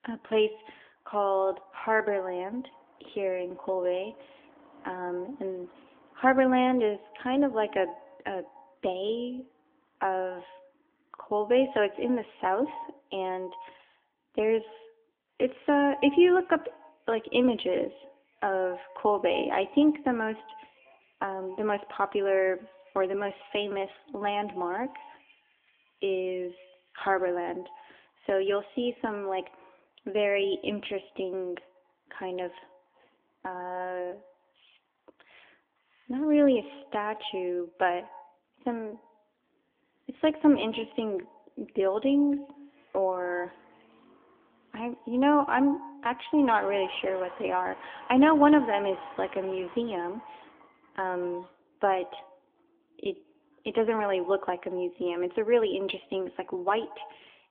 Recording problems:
echo of what is said; faint; throughout; 90 ms later, 20 dB below the speech
phone-call audio; nothing above 3.5 kHz
traffic noise; faint; throughout; 25 dB below the speech

